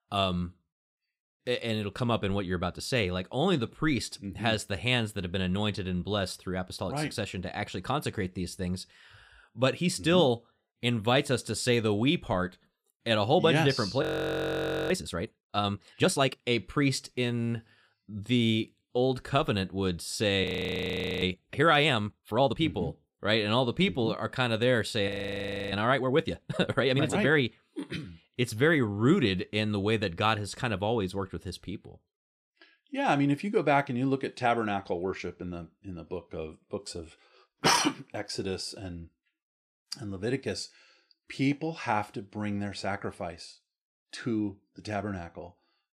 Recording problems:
audio freezing; at 14 s for 1 s, at 20 s for 1 s and at 25 s for 0.5 s

